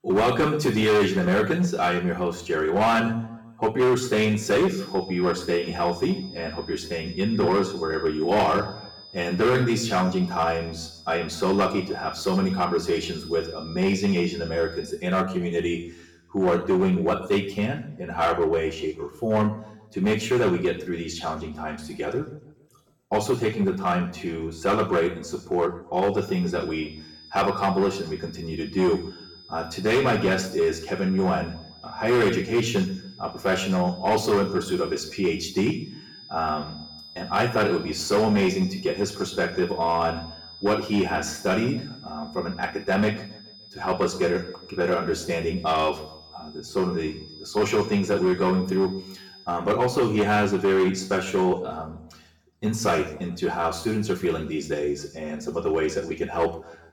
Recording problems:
off-mic speech; far
room echo; slight; dies away in 0.7 s
distortion; slight; 6% of the sound clipped
high-pitched whine; noticeable; from 4.5 to 15 s and from 26 to 49 s; 5 kHz, 20 dB below the speech

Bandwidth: 17.5 kHz